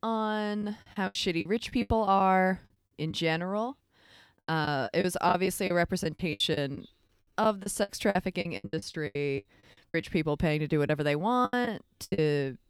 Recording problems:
choppy; very; 14% of the speech affected

